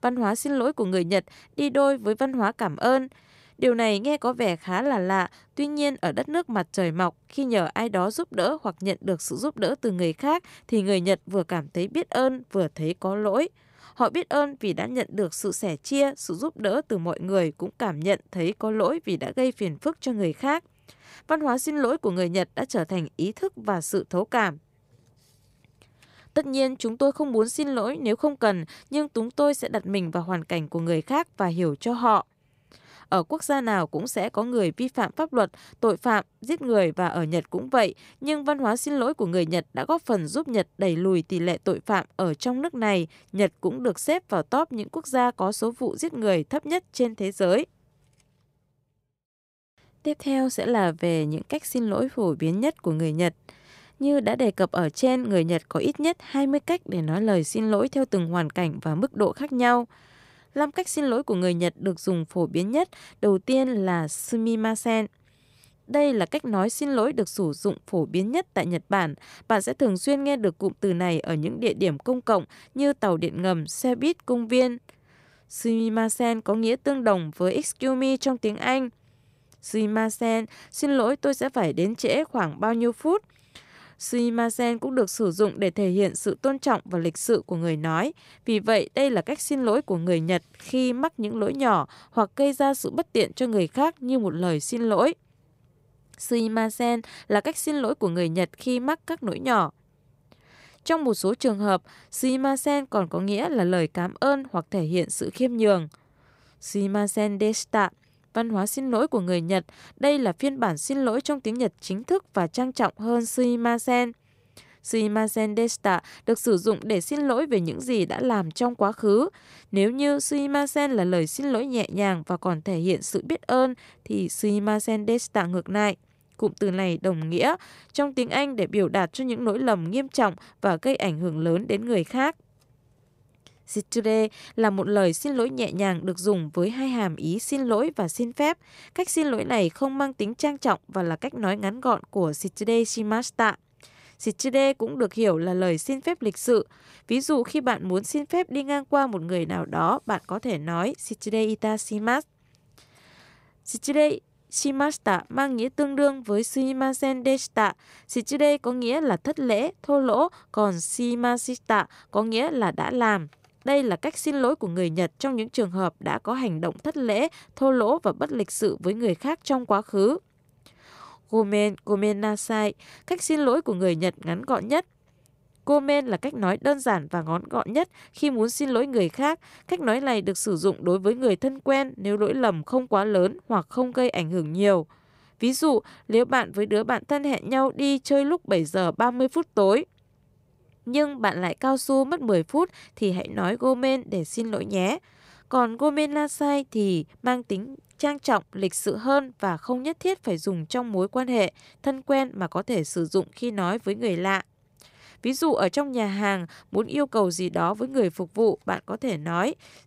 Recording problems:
none

